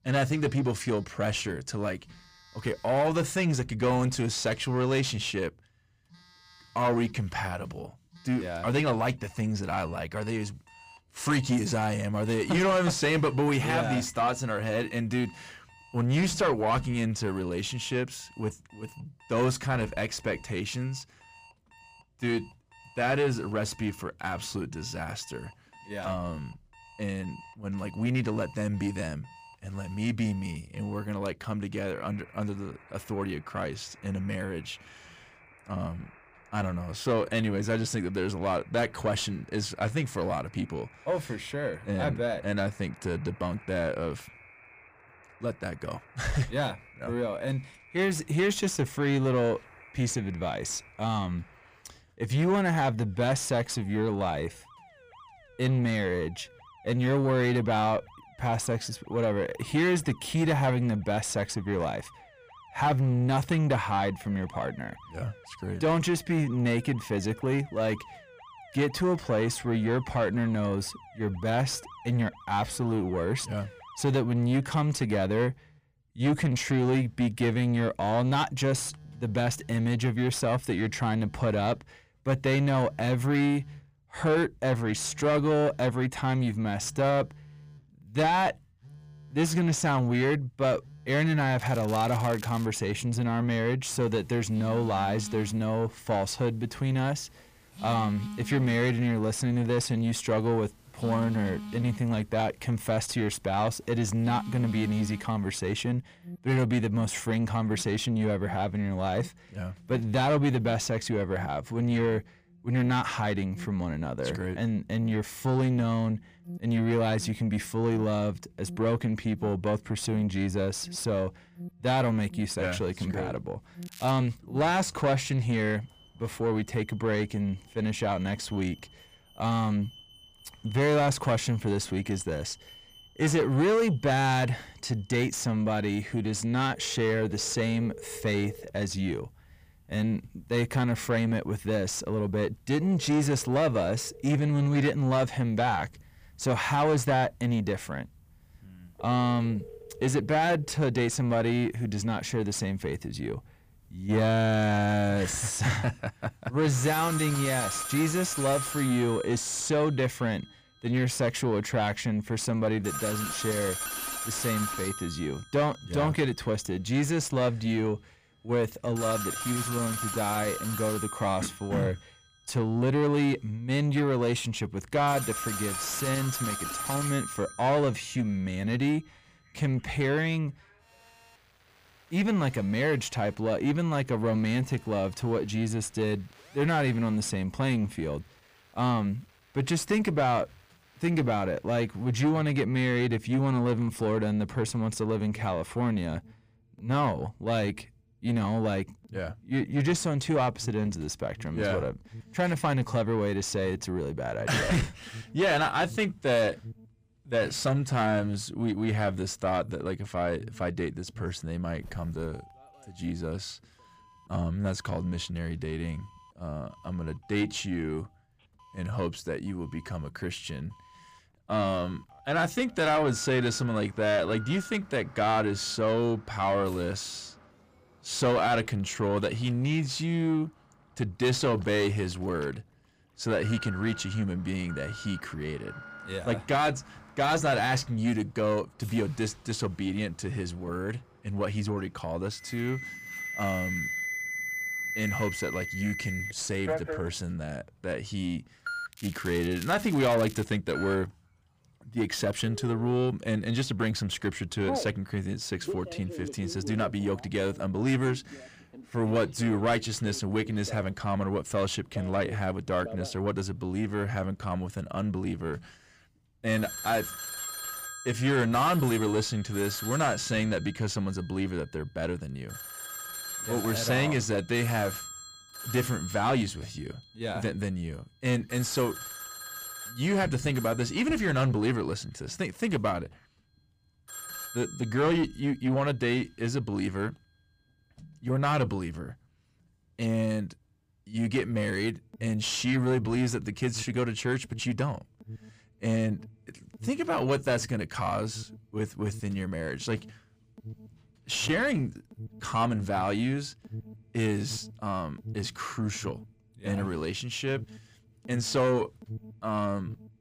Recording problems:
distortion; slight; 10 dB below the speech
alarms or sirens; noticeable; throughout; 10 dB below the speech
crackling; noticeable; from 1:32 to 1:33, at 2:04 and from 4:09 to 4:10; 15 dB below the speech

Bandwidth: 15 kHz